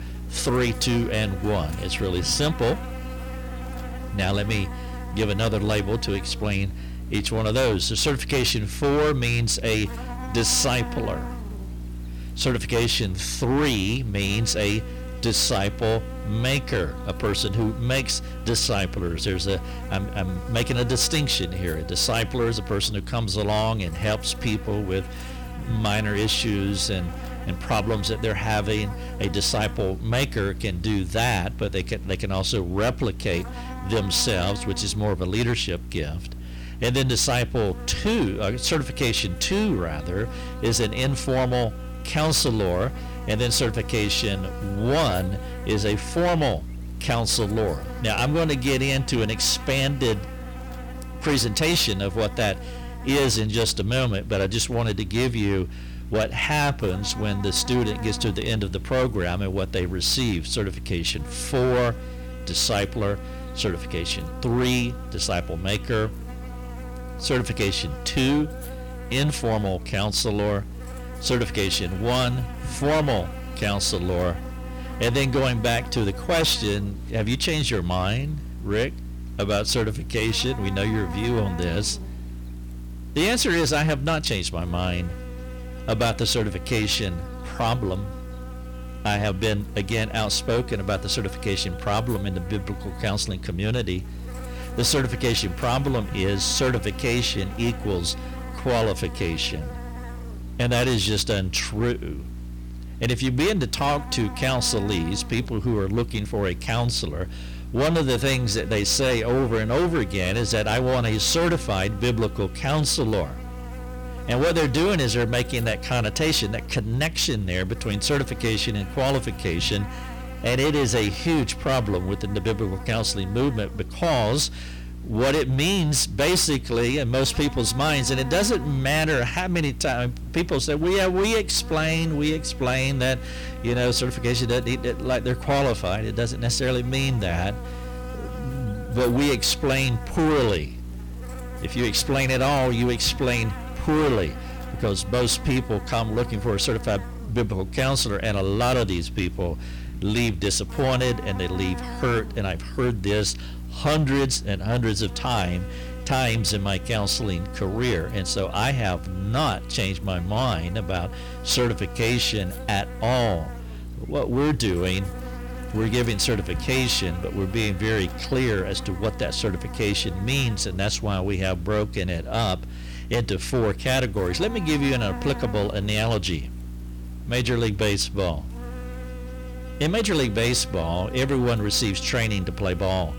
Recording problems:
distortion; heavy; 11% of the sound clipped
electrical hum; noticeable; throughout; 60 Hz, 15 dB below the speech

